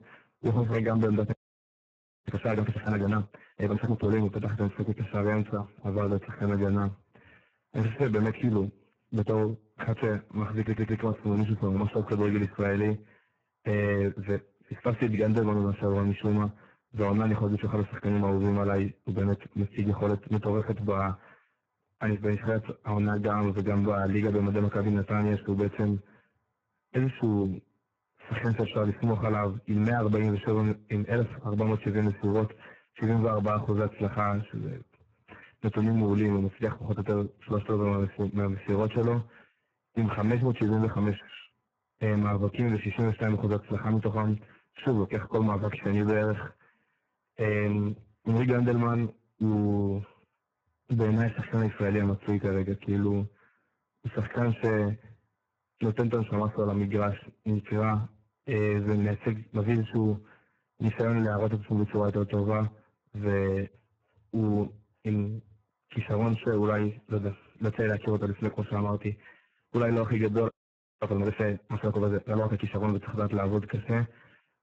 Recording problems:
garbled, watery; badly
distortion; slight; 5% of the sound clipped
audio freezing; at 1.5 s for 1 s and at 1:10 for 0.5 s
audio stuttering; at 11 s

